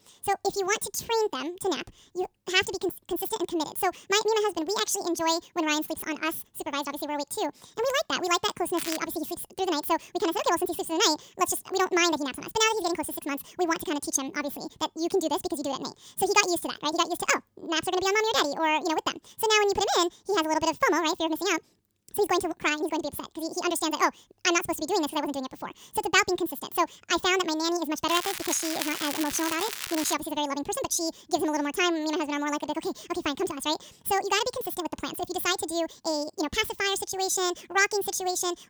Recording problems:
wrong speed and pitch; too fast and too high; 1.7 times normal speed
crackling; loud; at 9 s and from 28 to 30 s; 6 dB below the speech

